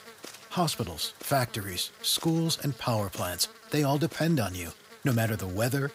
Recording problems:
electrical hum; noticeable; throughout; 60 Hz, 15 dB below the speech

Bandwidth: 15.5 kHz